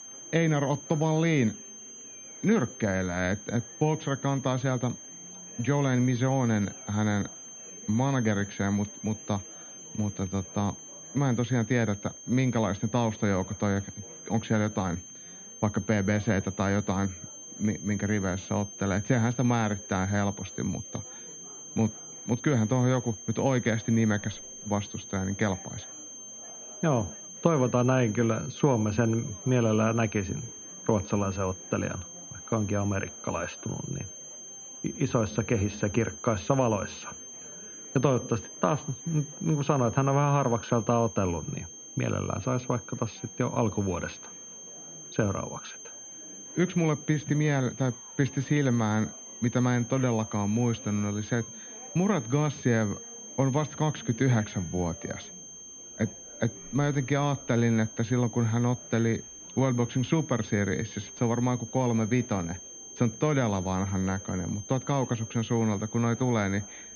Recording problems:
muffled; very; fading above 3.5 kHz
high-pitched whine; noticeable; throughout; 6.5 kHz, 15 dB below the speech
murmuring crowd; faint; throughout; 25 dB below the speech

